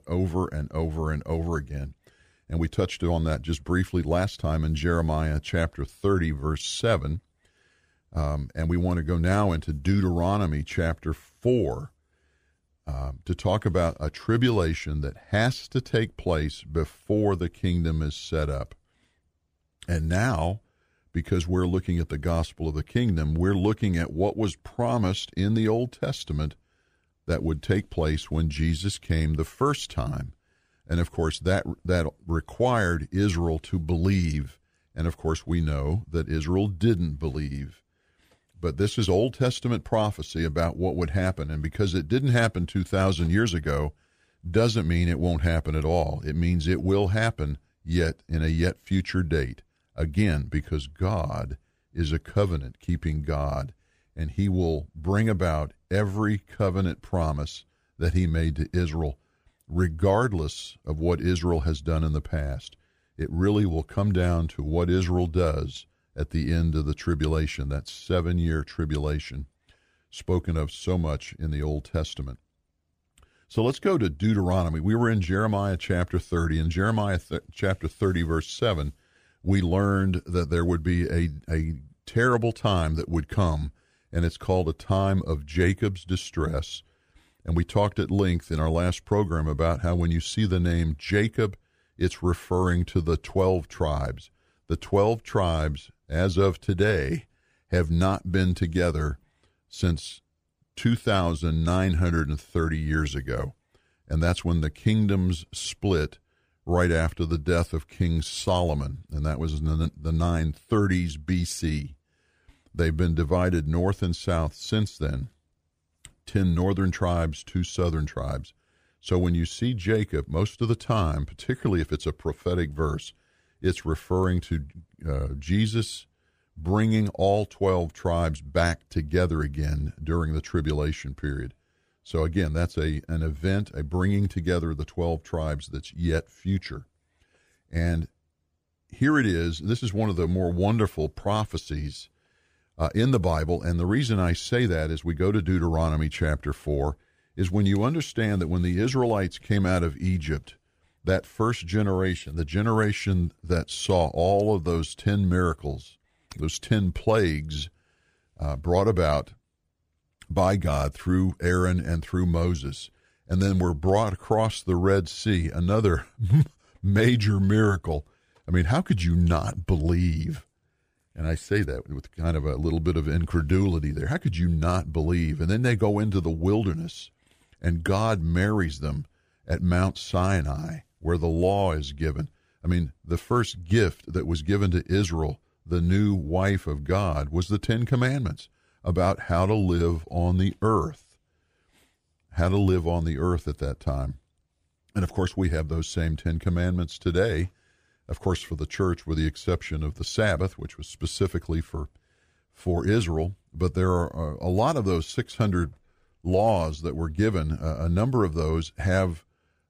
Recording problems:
none

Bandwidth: 15 kHz